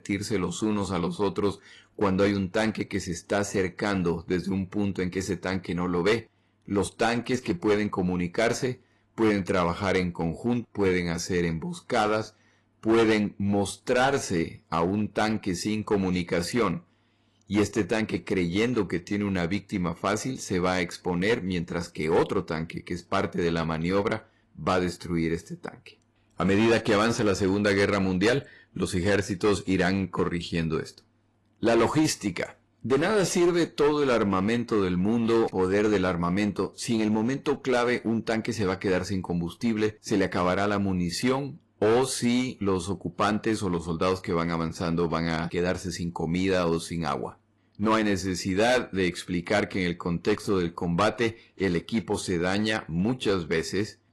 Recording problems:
distortion; slight; 6% of the sound clipped
garbled, watery; slightly; nothing above 11.5 kHz

